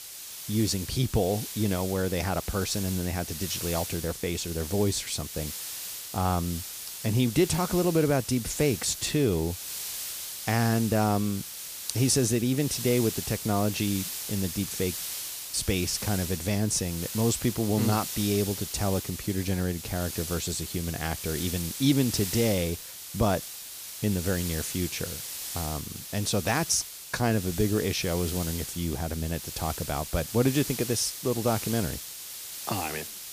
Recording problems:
hiss; loud; throughout; 7 dB below the speech

